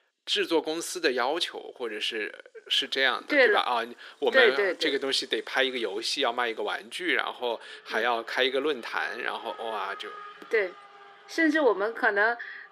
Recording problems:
thin; somewhat; fading below 350 Hz
traffic noise; faint; throughout; 20 dB below the speech

